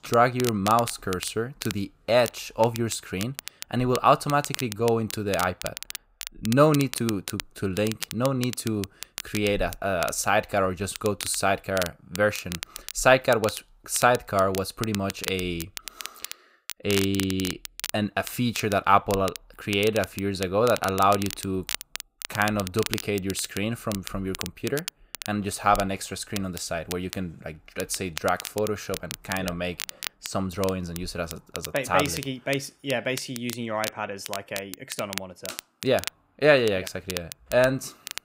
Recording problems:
crackle, like an old record; noticeable; 10 dB below the speech

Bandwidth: 15.5 kHz